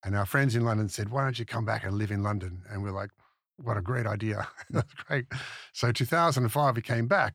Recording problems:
none

